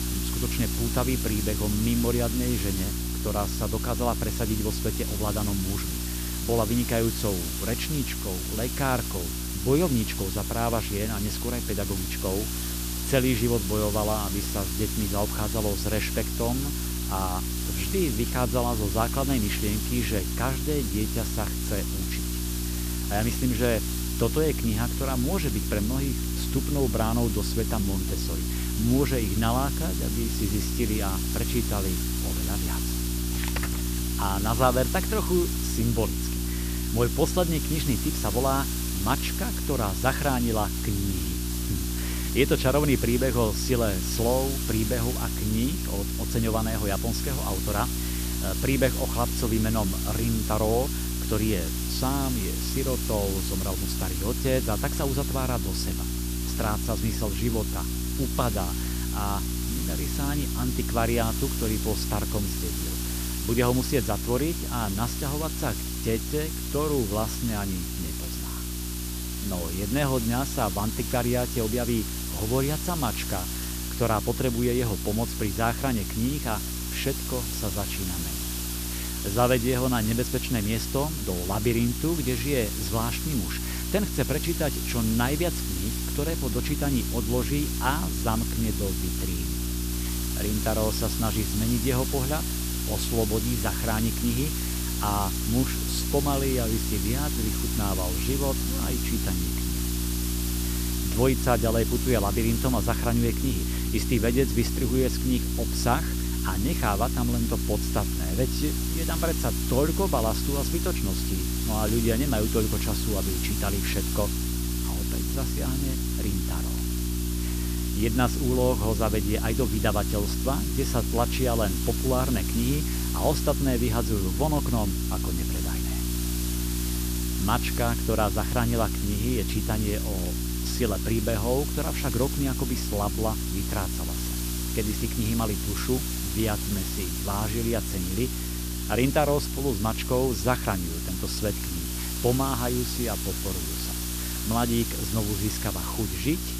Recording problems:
hiss; loud; throughout; 4 dB below the speech
electrical hum; noticeable; throughout; 60 Hz, 10 dB below the speech
crackle, like an old record; faint; 30 dB below the speech

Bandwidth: 14.5 kHz